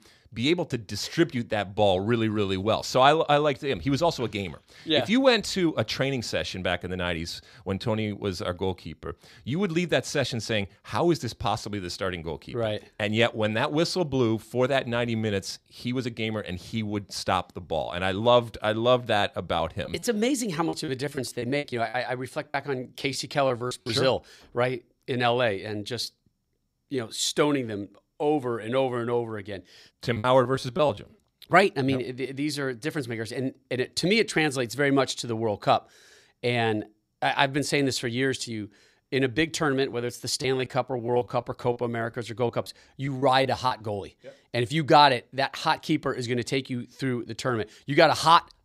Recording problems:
choppy; very; from 19 to 24 s, from 30 to 31 s and from 40 to 44 s; 13% of the speech affected

